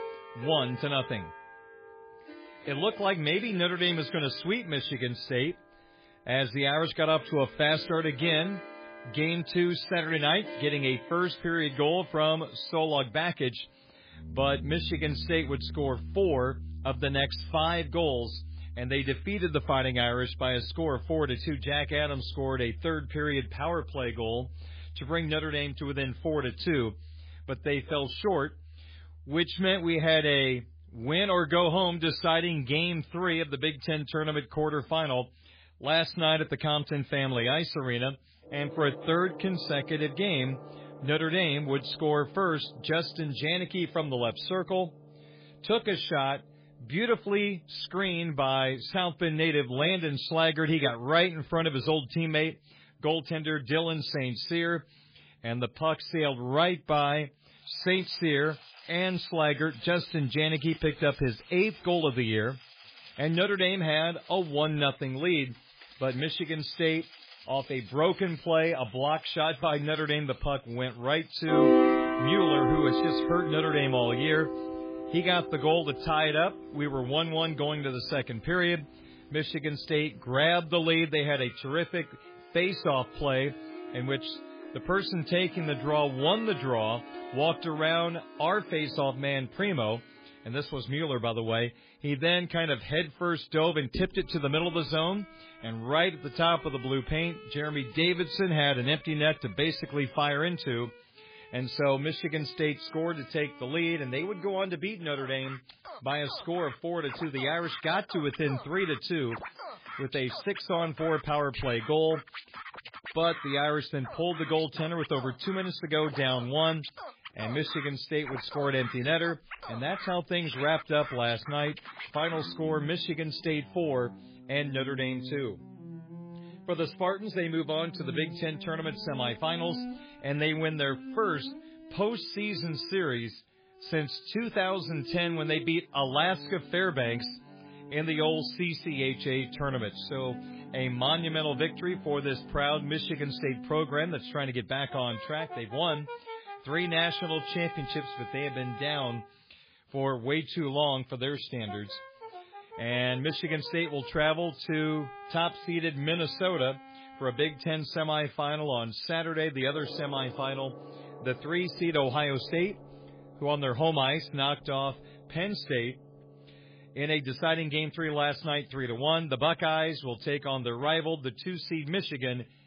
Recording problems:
garbled, watery; badly; nothing above 5 kHz
background music; noticeable; throughout; 10 dB below the speech

